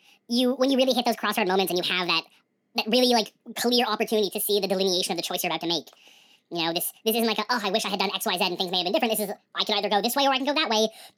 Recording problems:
wrong speed and pitch; too fast and too high; 1.7 times normal speed

